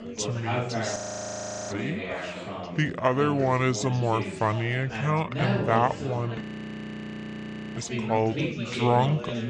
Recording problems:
wrong speed and pitch; too slow and too low; 0.7 times normal speed
chatter from many people; loud; throughout; 6 dB below the speech
audio freezing; at 1 s for 0.5 s and at 6.5 s for 1.5 s

